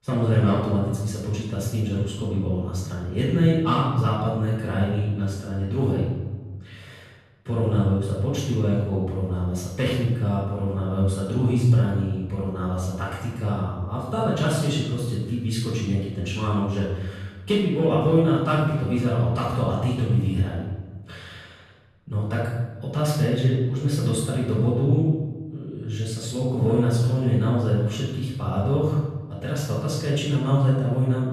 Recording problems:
room echo; strong; dies away in 1.1 s
off-mic speech; far

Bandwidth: 13.5 kHz